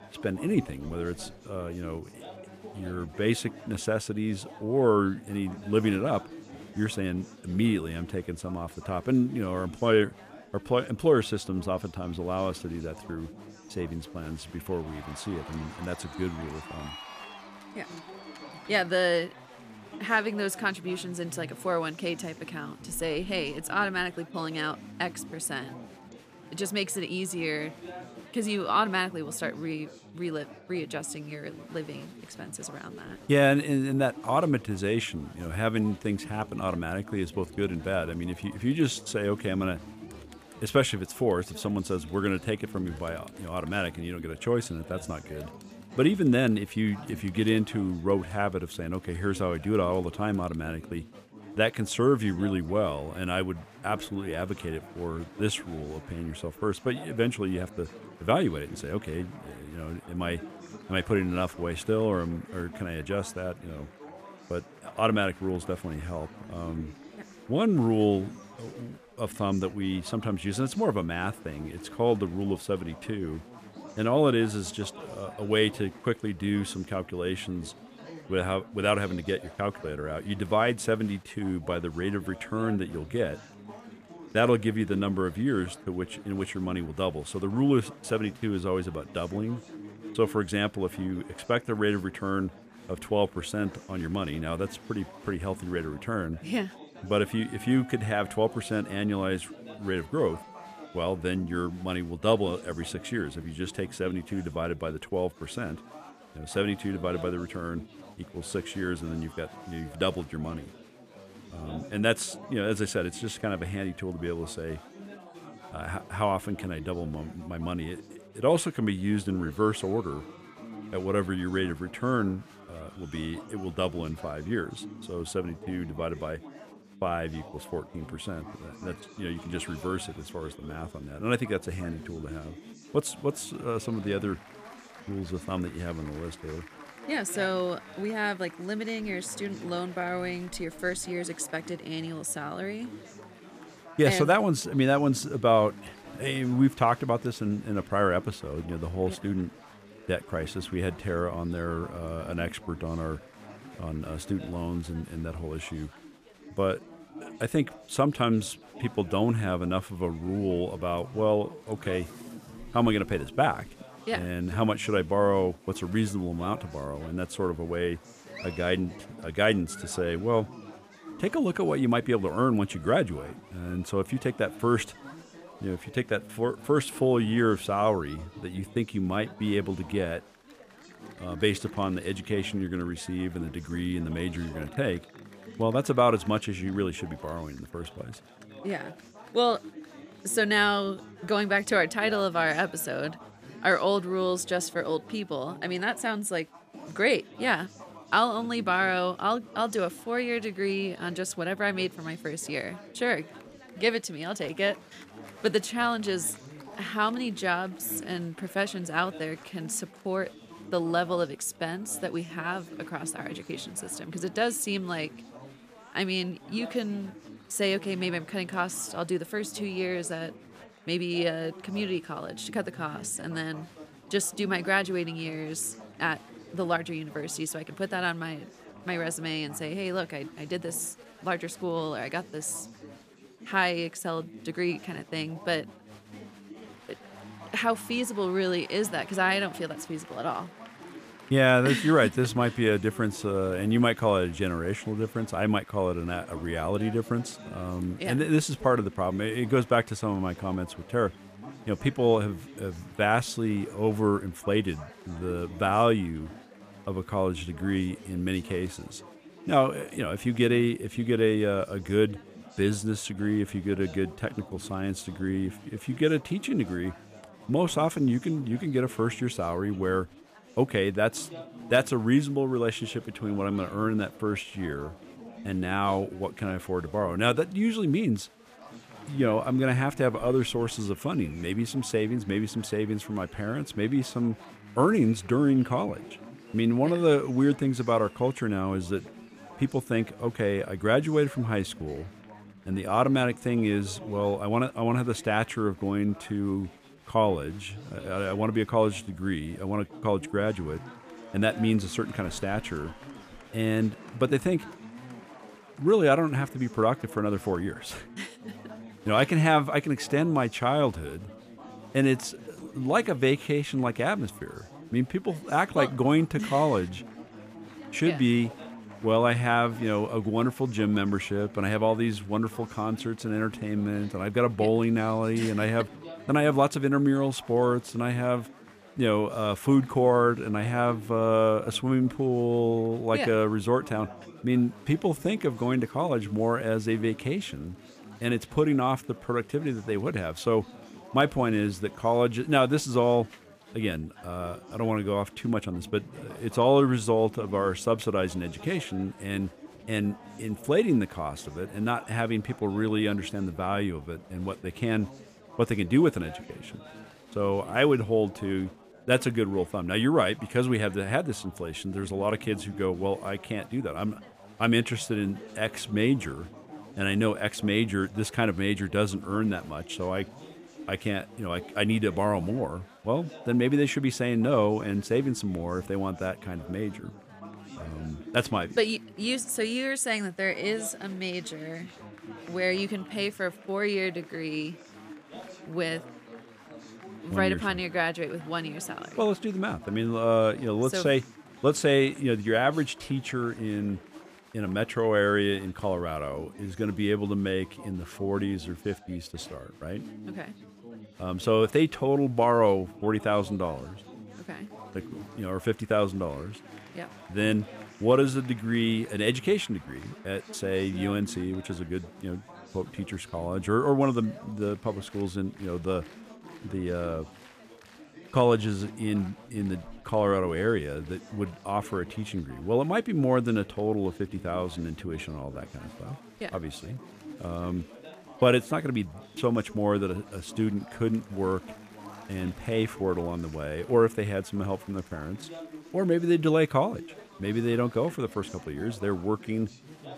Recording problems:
chatter from many people; noticeable; throughout; 20 dB below the speech

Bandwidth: 14.5 kHz